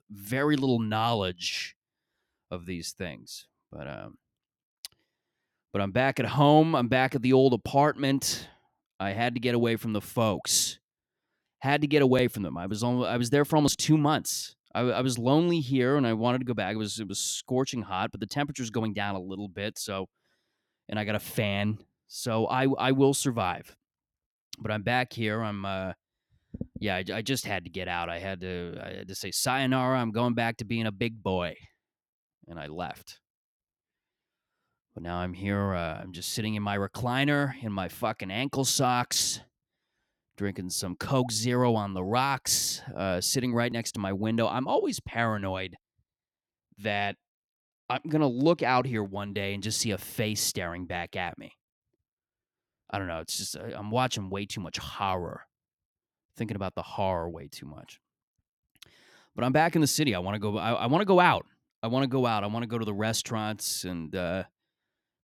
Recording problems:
none

